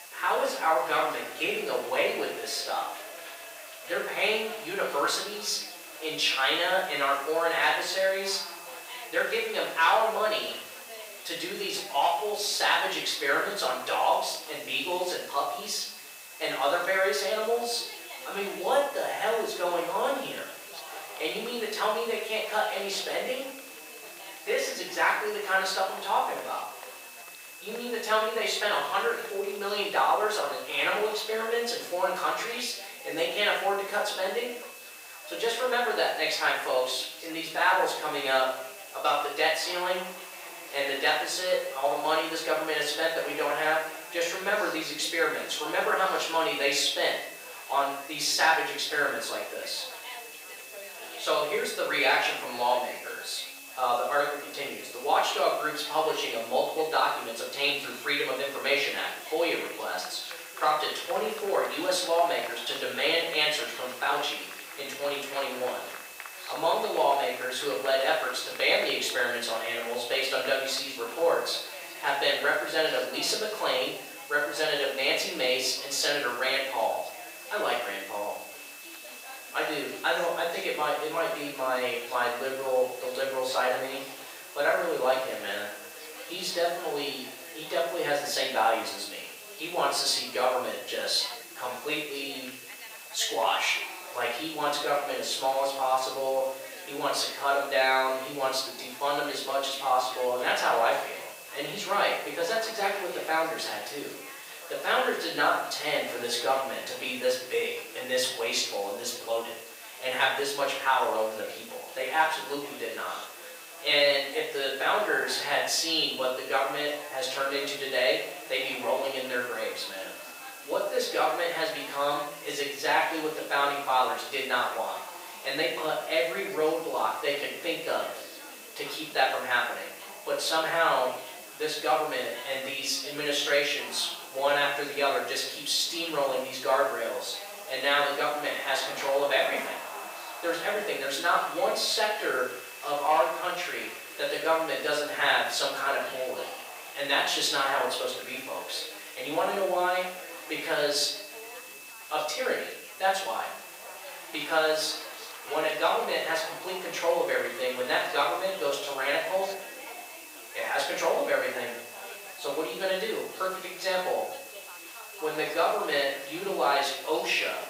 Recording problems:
off-mic speech; far
thin; very; fading below 700 Hz
room echo; noticeable; dies away in 0.6 s
chatter from many people; noticeable; throughout; 15 dB below the speech
hiss; noticeable; throughout; 15 dB below the speech
high-pitched whine; faint; throughout; 2.5 kHz, 20 dB below the speech

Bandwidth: 15.5 kHz